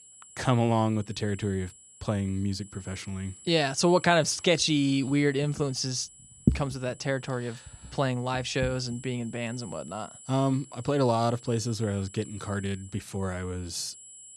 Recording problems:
high-pitched whine; noticeable; throughout; 7.5 kHz, 20 dB below the speech

